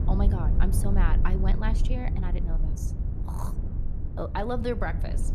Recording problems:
low rumble; loud; throughout; 9 dB below the speech

